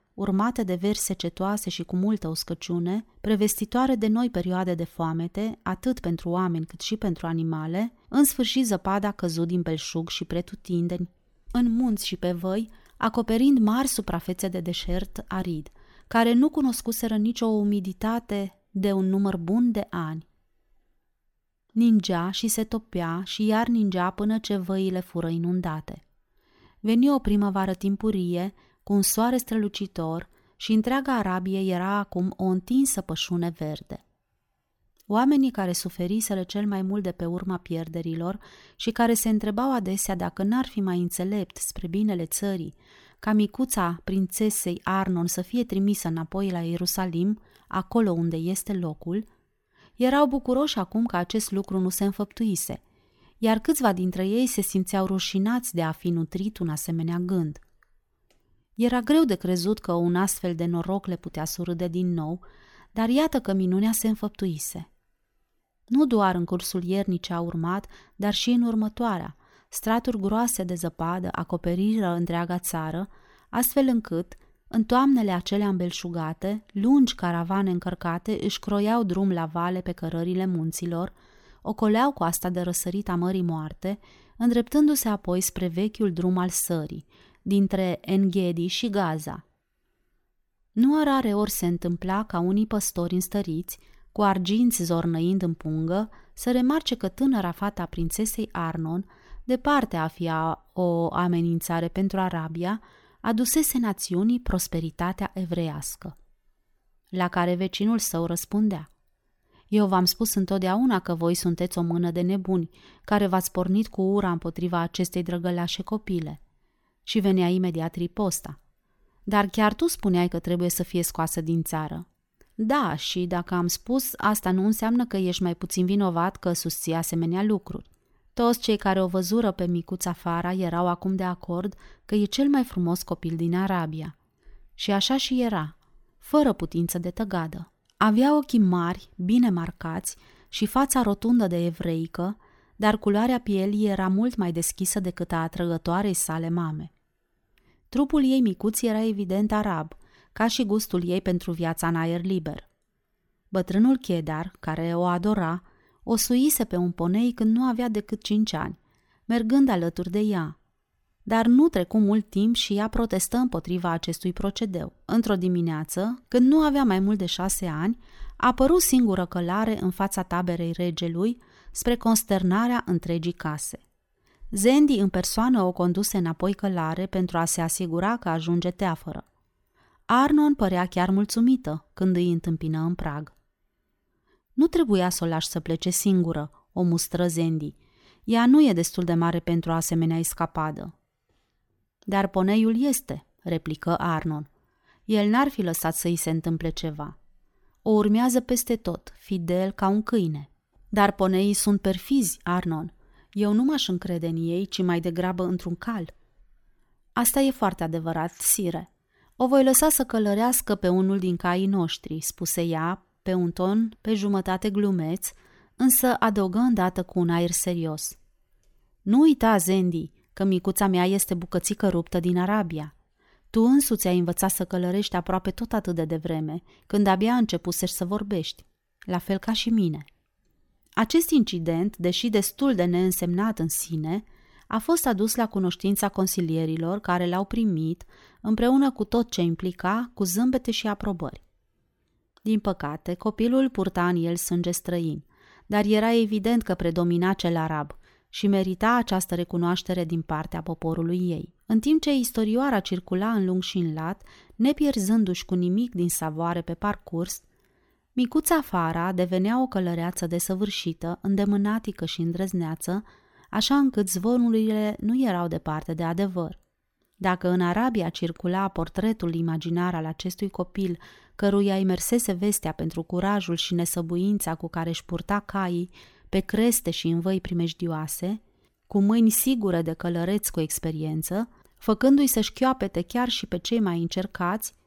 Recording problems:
none

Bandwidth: 18 kHz